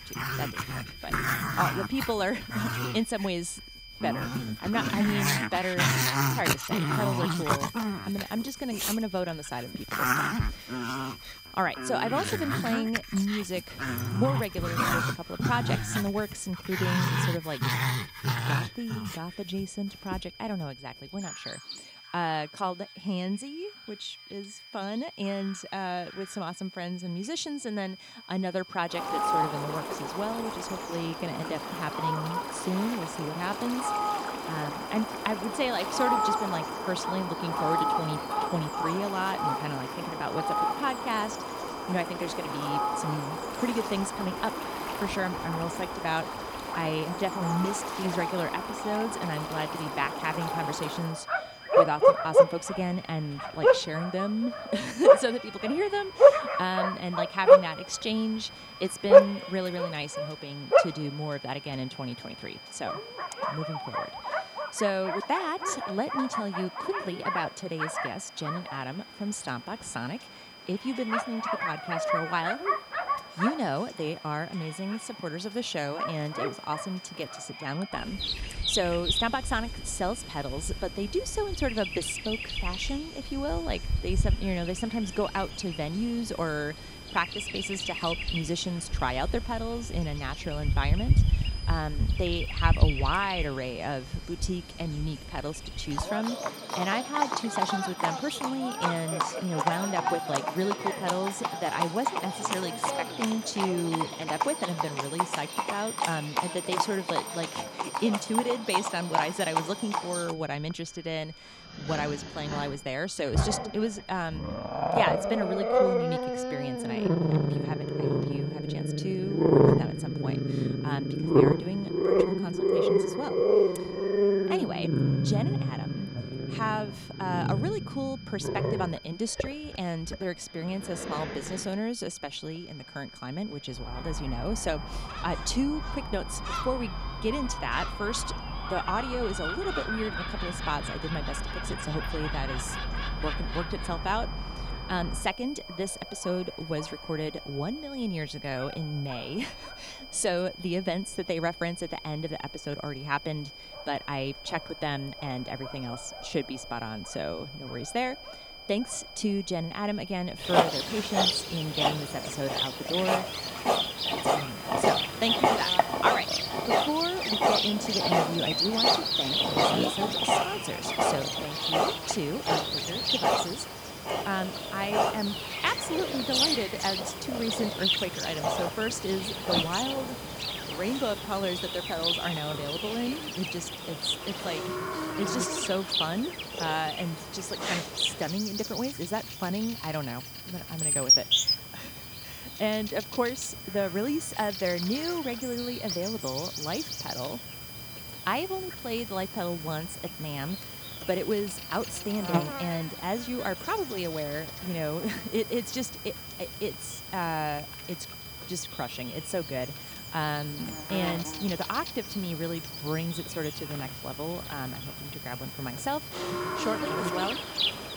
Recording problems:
animal sounds; very loud; throughout; 3 dB above the speech
high-pitched whine; noticeable; throughout; 5 kHz, 15 dB below the speech

